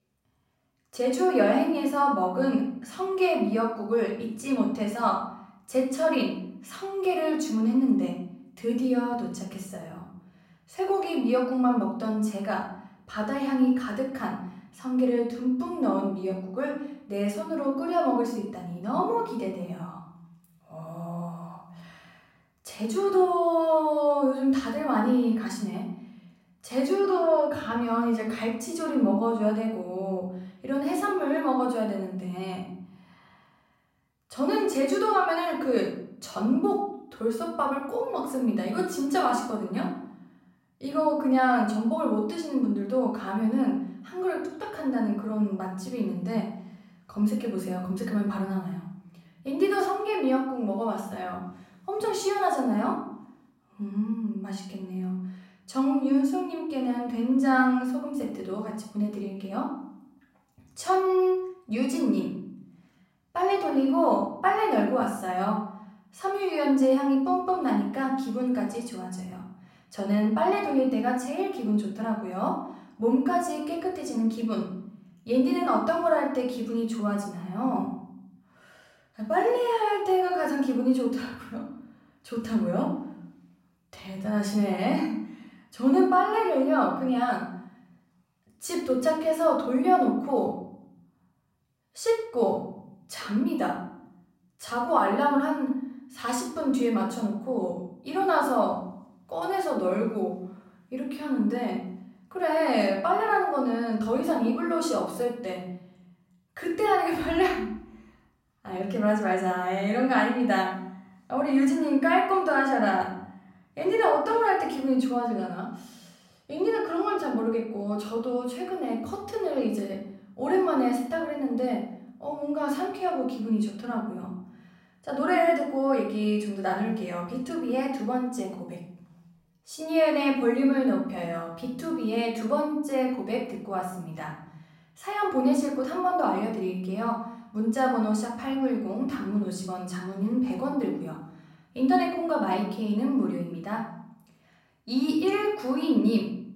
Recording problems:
off-mic speech; far
room echo; noticeable; dies away in 0.8 s

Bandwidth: 16 kHz